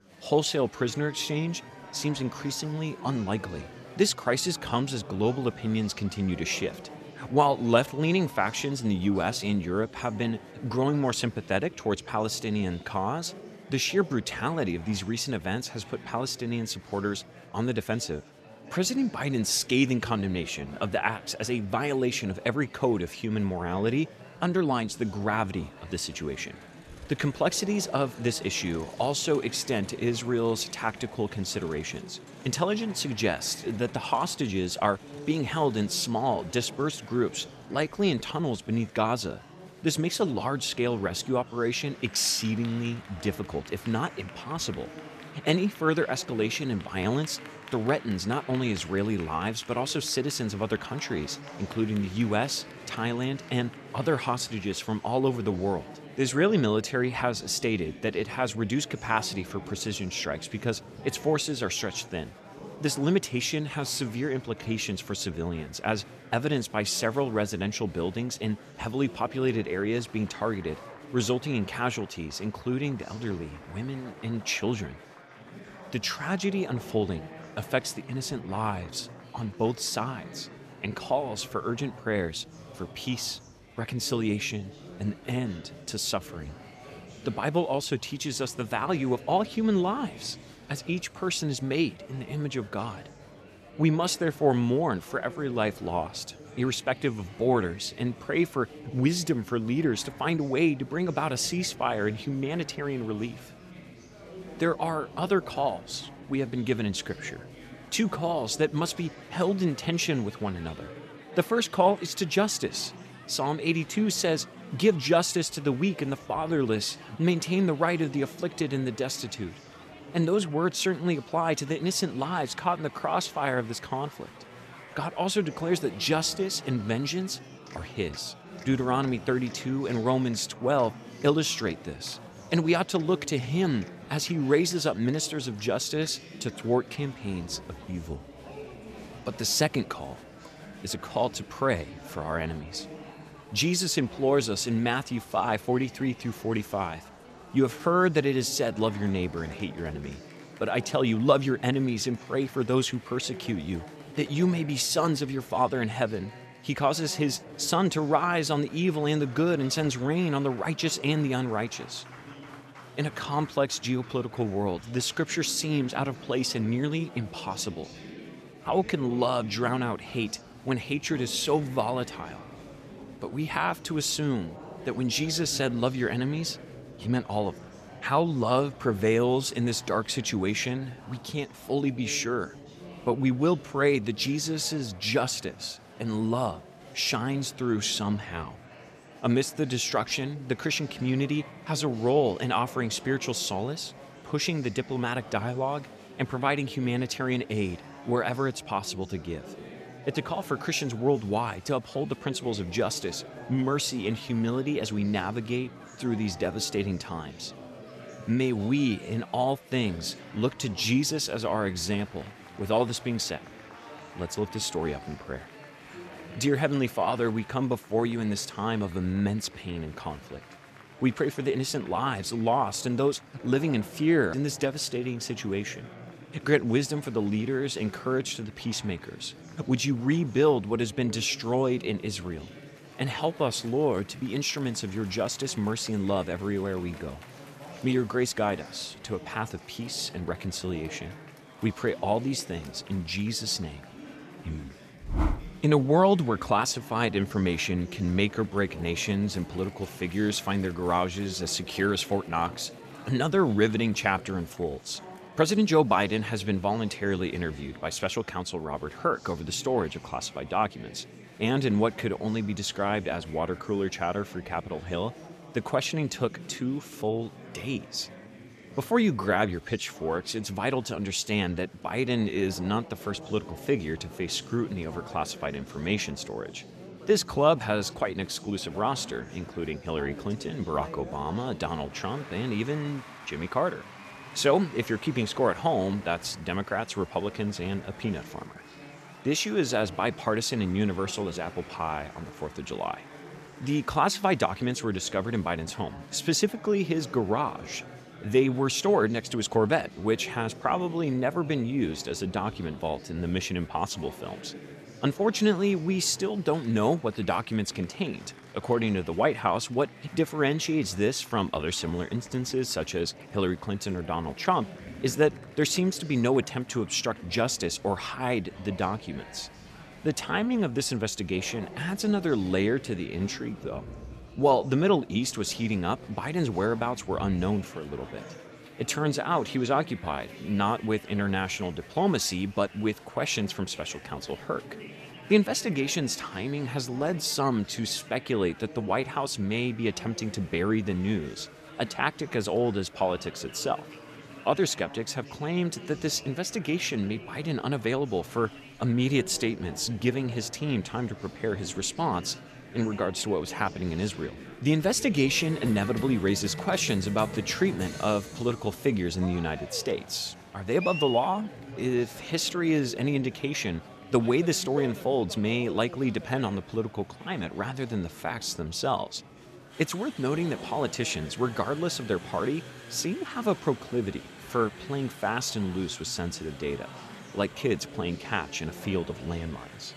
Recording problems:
murmuring crowd; noticeable; throughout; 15 dB below the speech

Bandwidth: 14.5 kHz